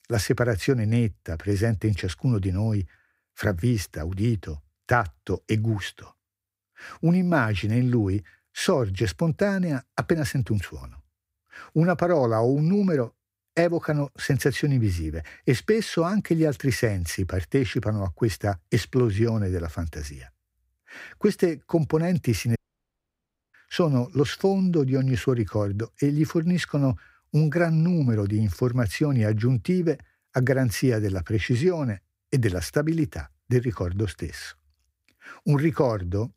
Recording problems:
audio cutting out; at 23 s for 1 s

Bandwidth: 15.5 kHz